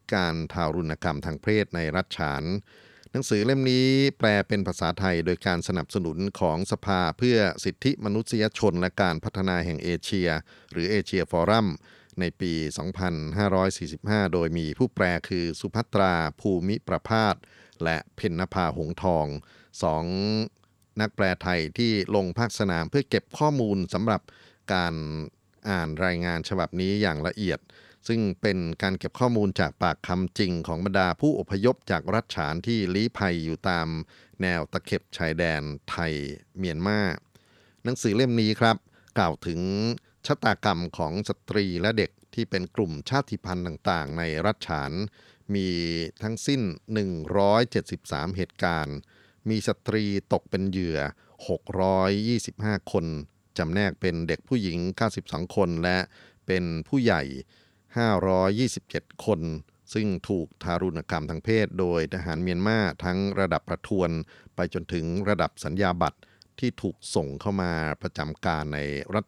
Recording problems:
none

